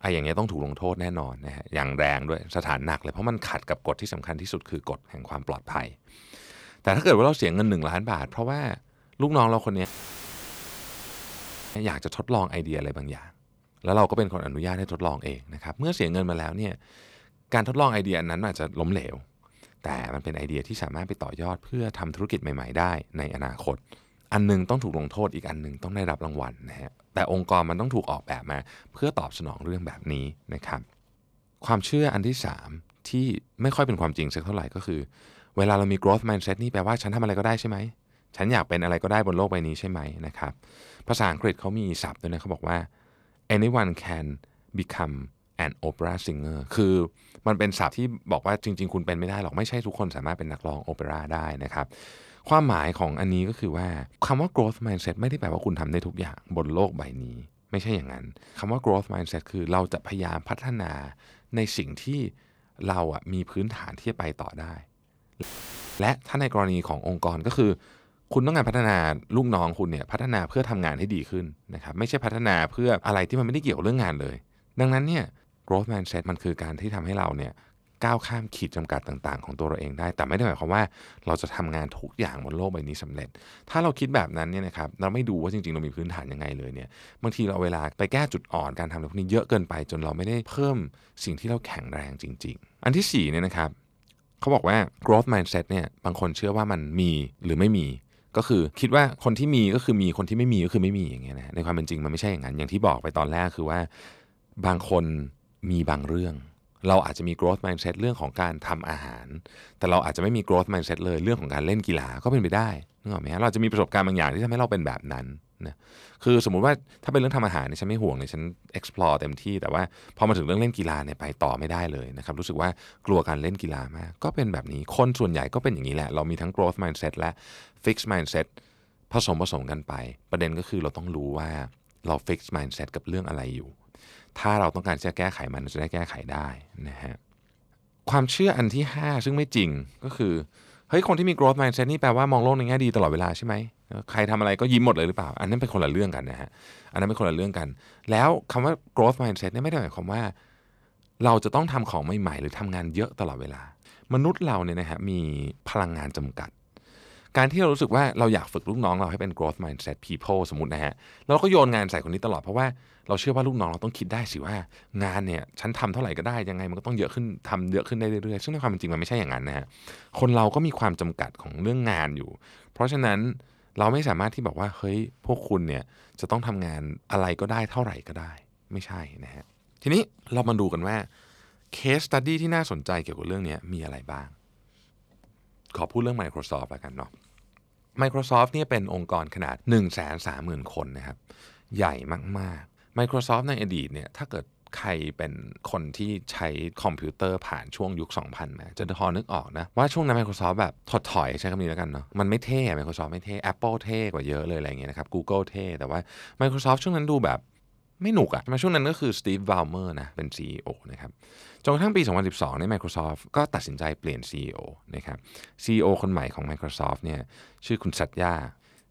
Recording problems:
audio cutting out; filled with static; at 10 s for 2 s and at 1:05 for 0.5 s

